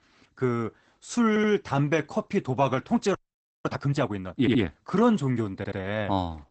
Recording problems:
garbled, watery; badly; nothing above 8 kHz
audio stuttering; at 1.5 s, at 4.5 s and at 5.5 s
audio freezing; at 3 s for 0.5 s

